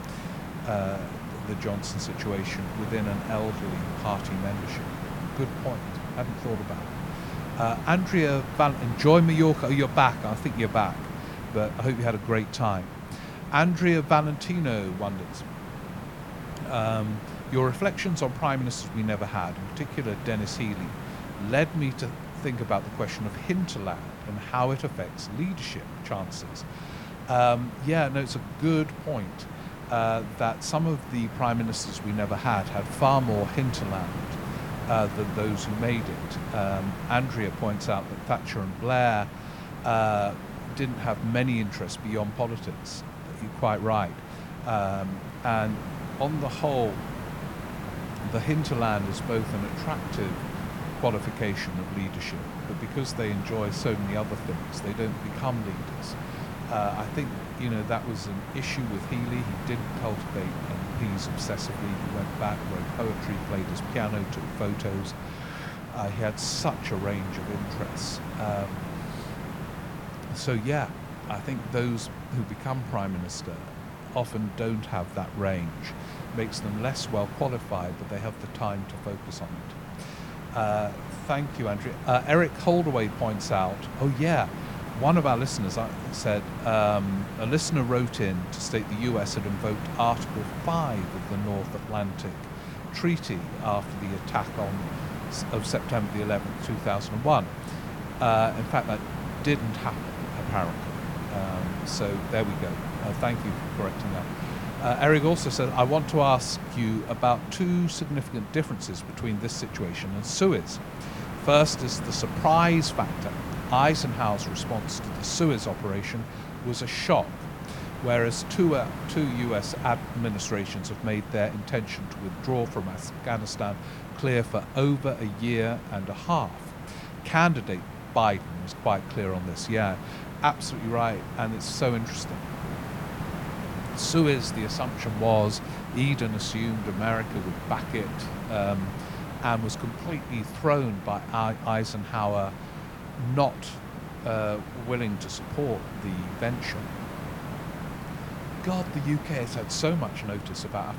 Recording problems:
hiss; loud; throughout; 8 dB below the speech

